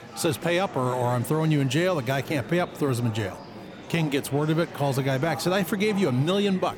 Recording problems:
murmuring crowd; noticeable; throughout; 15 dB below the speech

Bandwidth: 17.5 kHz